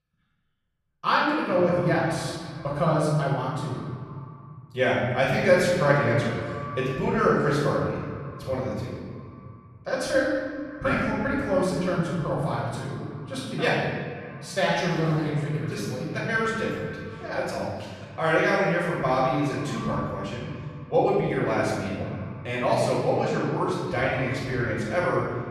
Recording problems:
room echo; strong; dies away in 2 s
off-mic speech; far
echo of what is said; faint; throughout; 270 ms later, 20 dB below the speech

